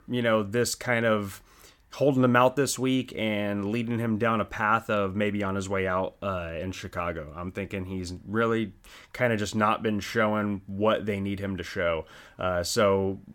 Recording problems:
none

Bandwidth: 17 kHz